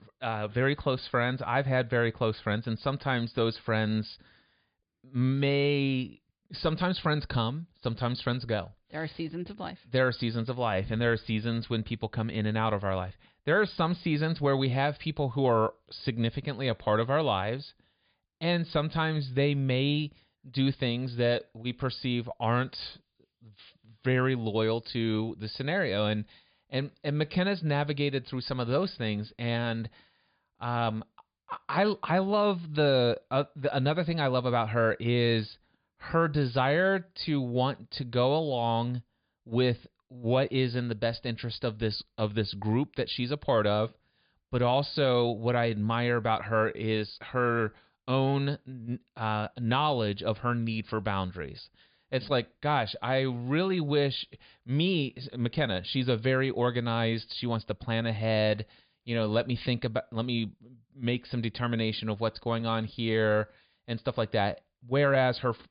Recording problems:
high frequencies cut off; severe; nothing above 5 kHz

